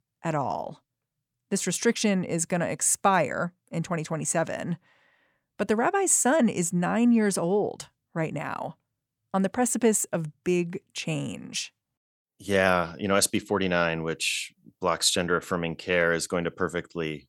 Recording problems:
none

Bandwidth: 18 kHz